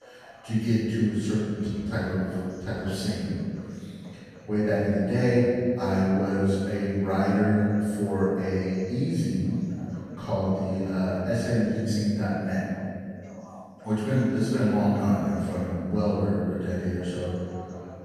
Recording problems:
room echo; strong; dies away in 2.3 s
off-mic speech; far
voice in the background; faint; throughout; 25 dB below the speech

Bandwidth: 14.5 kHz